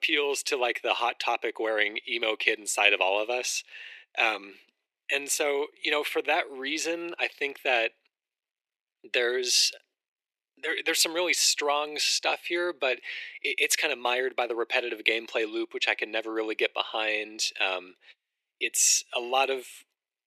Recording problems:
thin; very; fading below 350 Hz

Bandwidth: 13.5 kHz